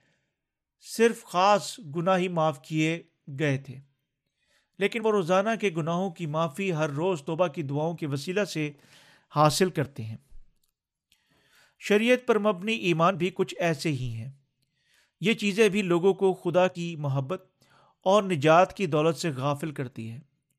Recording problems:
uneven, jittery; slightly; from 3.5 to 17 s

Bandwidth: 14.5 kHz